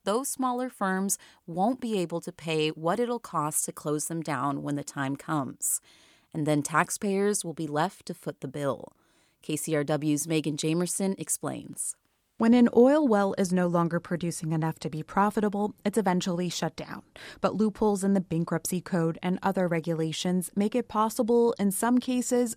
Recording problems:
none

